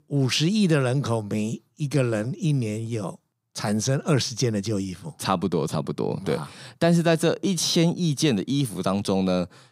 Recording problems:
none

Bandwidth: 15.5 kHz